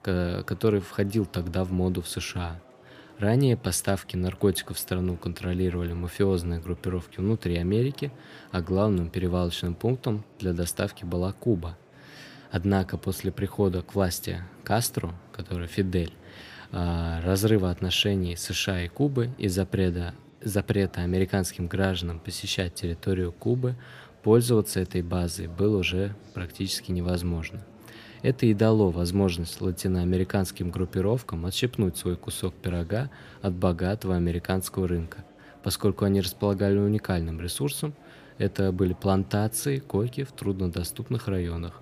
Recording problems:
murmuring crowd; faint; throughout; 25 dB below the speech

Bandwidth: 15 kHz